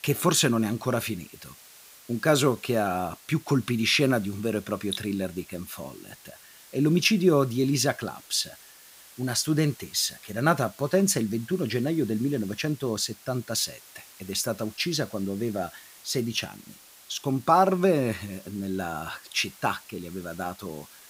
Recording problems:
hiss; faint; throughout; 20 dB below the speech

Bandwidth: 15.5 kHz